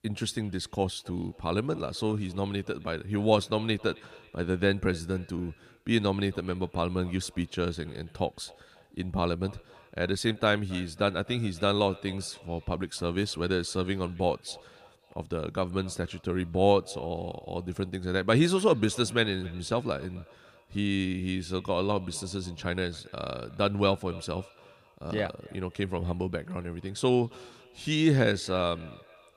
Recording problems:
echo of what is said; faint; throughout; 270 ms later, 25 dB below the speech

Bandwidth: 15 kHz